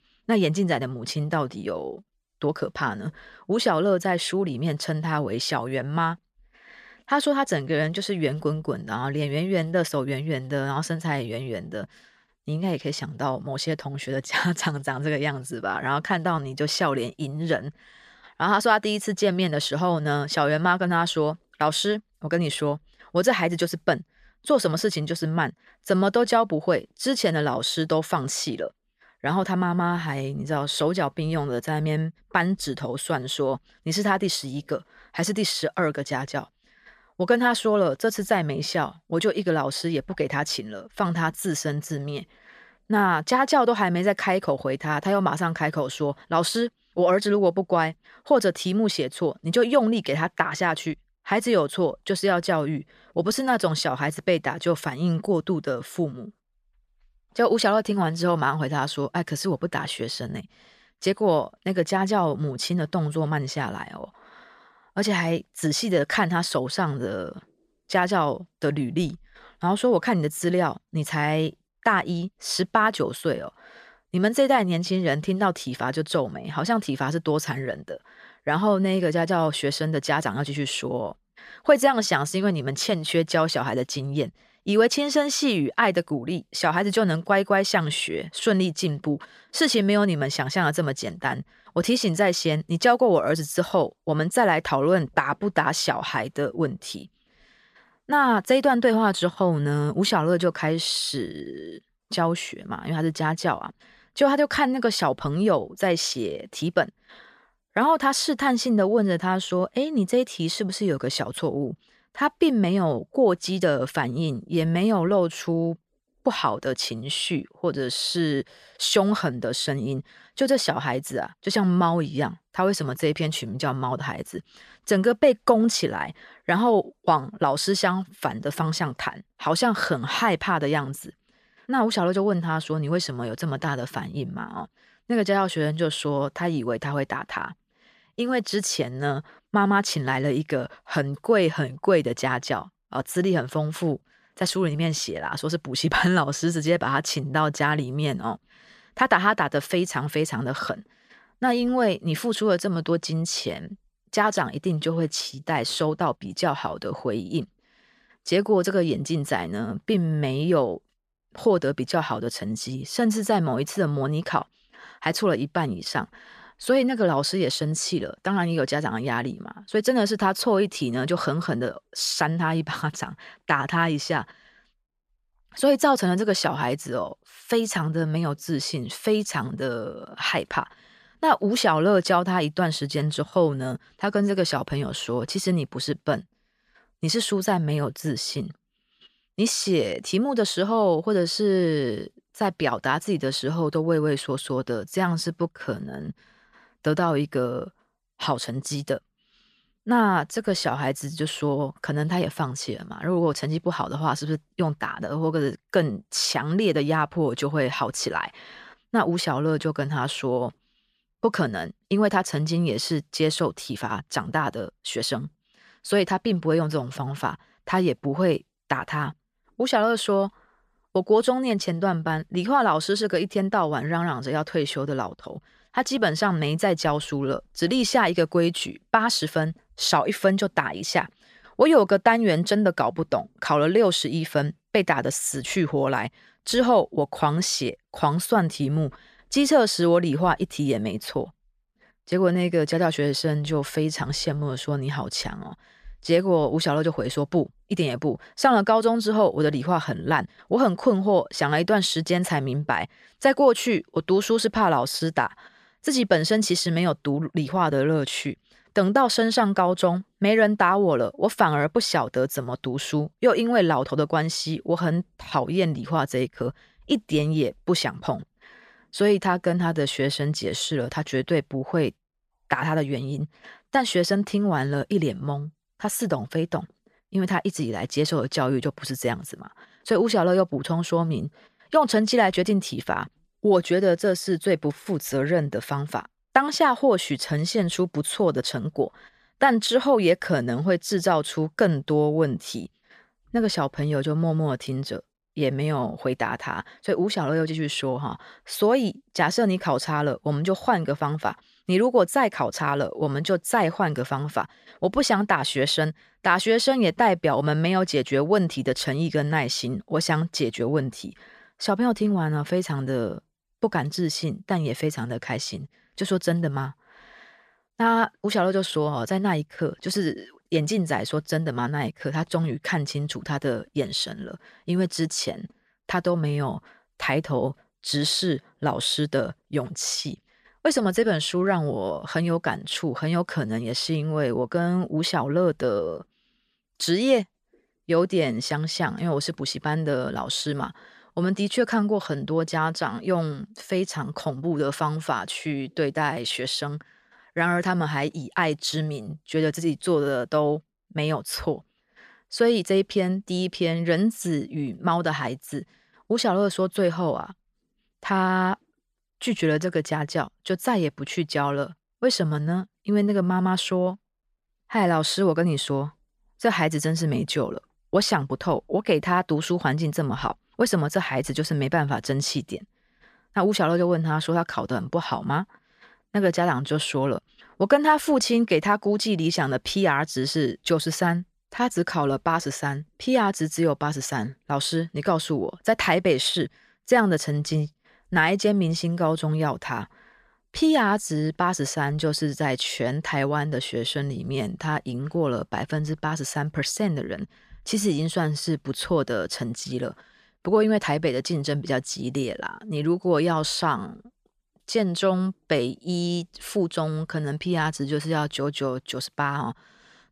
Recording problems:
none

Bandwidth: 14.5 kHz